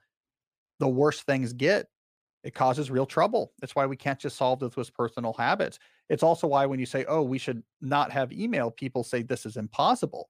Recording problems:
none

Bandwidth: 15 kHz